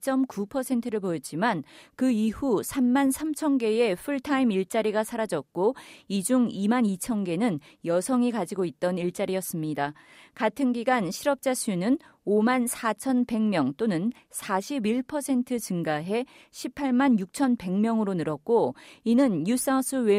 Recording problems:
abrupt cut into speech; at the end

